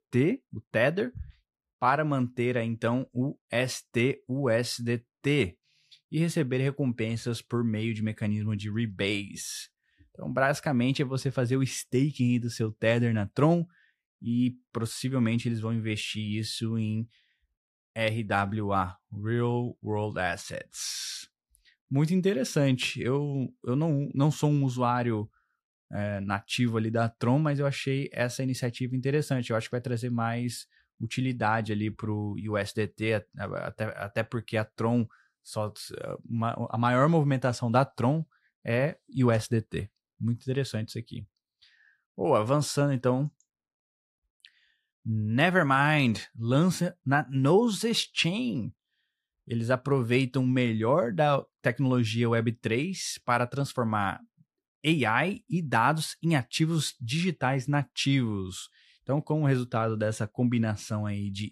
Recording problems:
none

